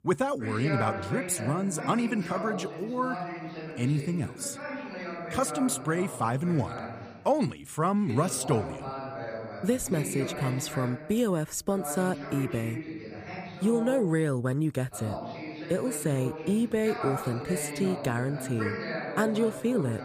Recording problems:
voice in the background; loud; throughout; 8 dB below the speech

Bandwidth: 15 kHz